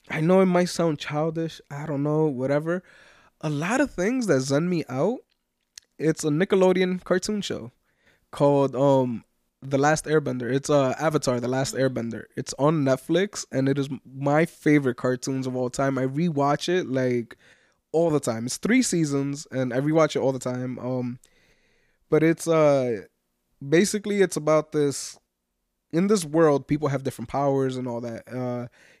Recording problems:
none

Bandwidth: 15 kHz